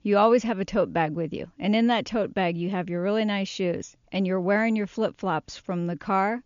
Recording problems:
high frequencies cut off; noticeable; nothing above 7 kHz

